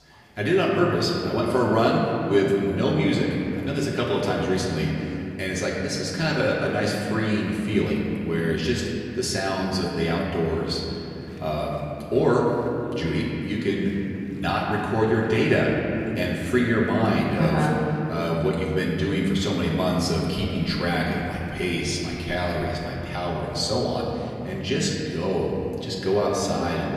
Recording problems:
off-mic speech; far
room echo; noticeable; dies away in 3 s
chatter from many people; faint; throughout; 30 dB below the speech
background music; very faint; from 20 s on; 20 dB below the speech

